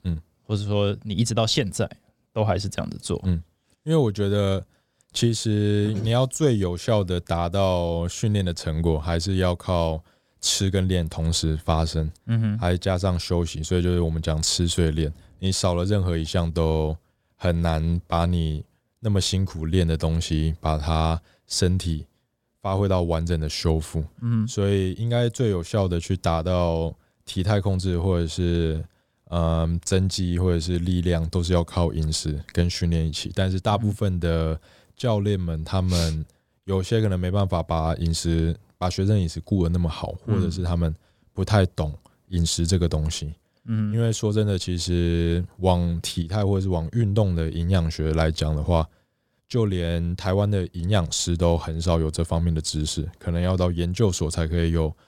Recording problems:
none

